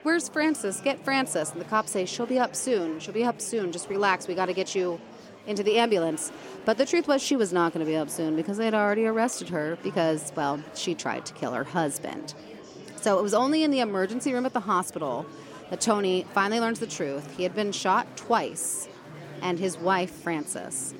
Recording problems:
murmuring crowd; noticeable; throughout; 15 dB below the speech

